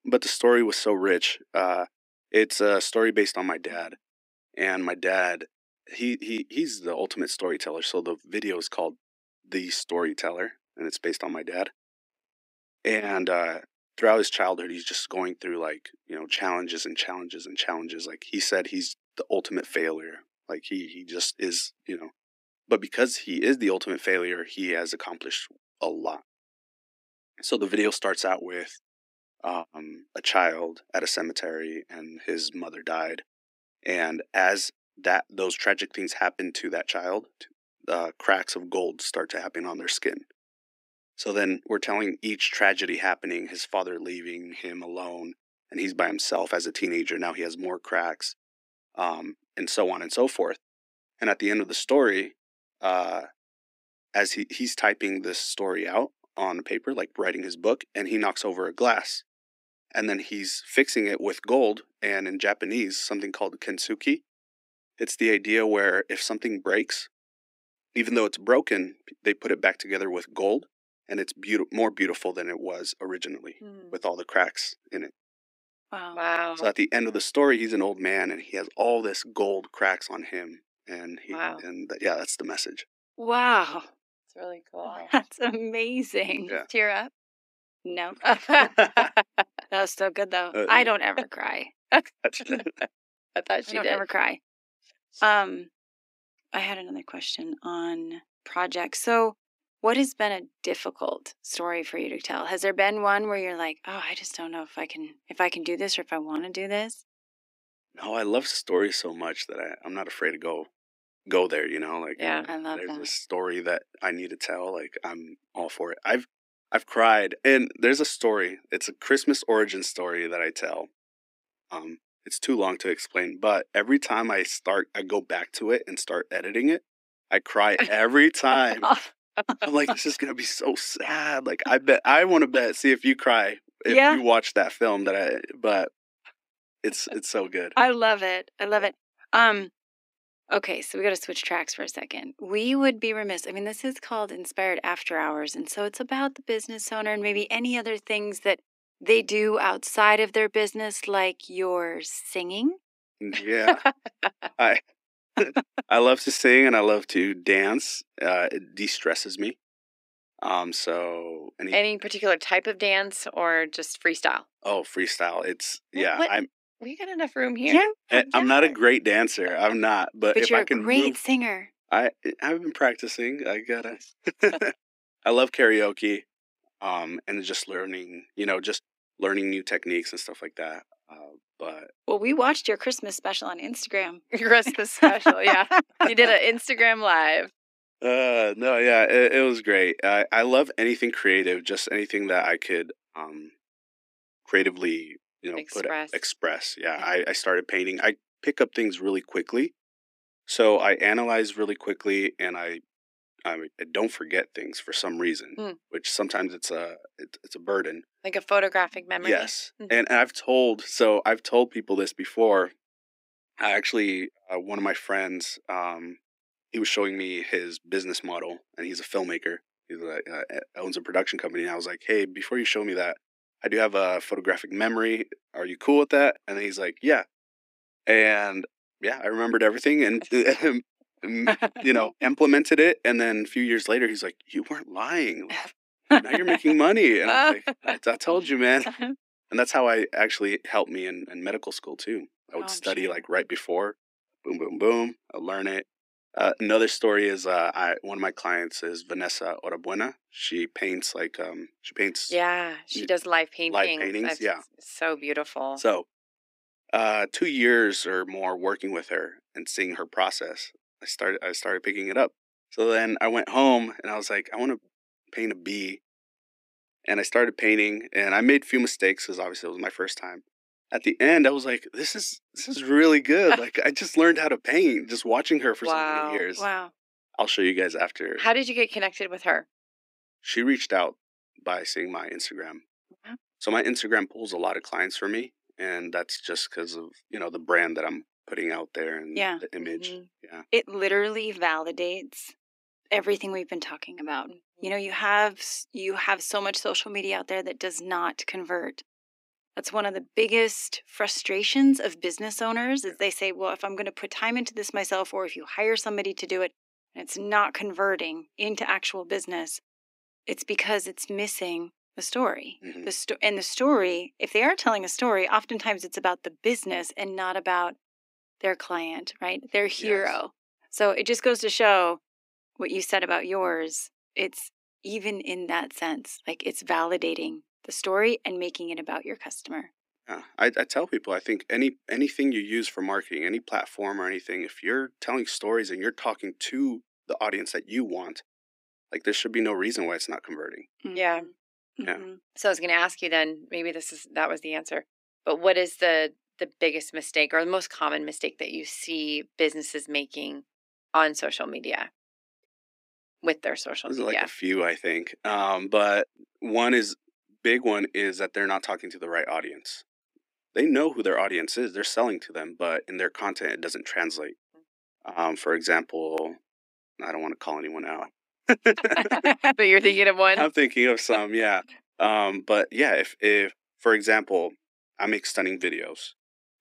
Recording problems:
thin; very slightly; fading below 250 Hz

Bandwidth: 15.5 kHz